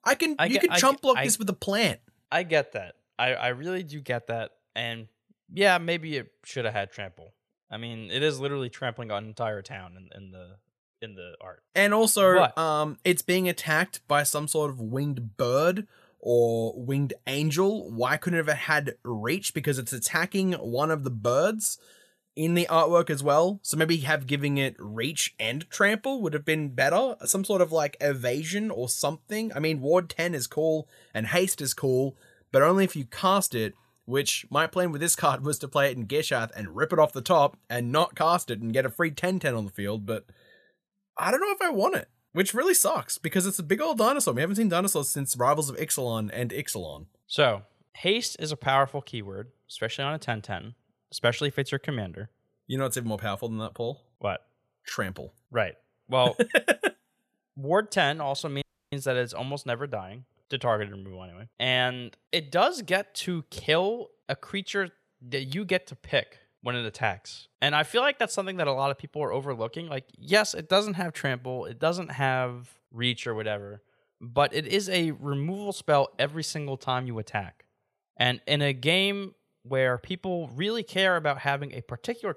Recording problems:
audio cutting out; at 59 s

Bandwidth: 14 kHz